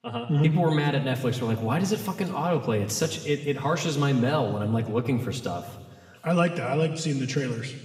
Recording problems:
room echo; slight; dies away in 1.4 s
off-mic speech; somewhat distant

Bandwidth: 15.5 kHz